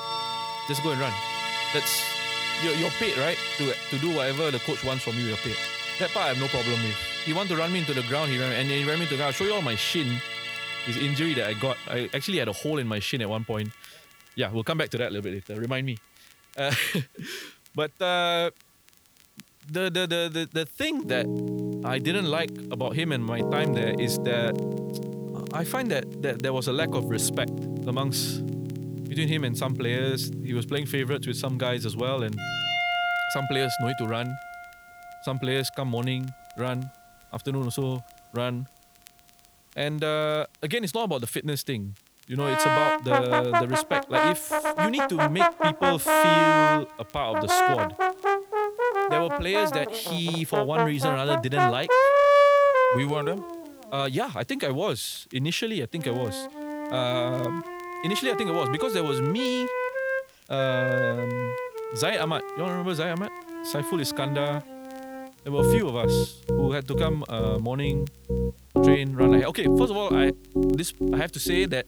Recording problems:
background music; very loud; throughout; 2 dB above the speech
hiss; faint; throughout; 30 dB below the speech
crackle, like an old record; faint; 30 dB below the speech

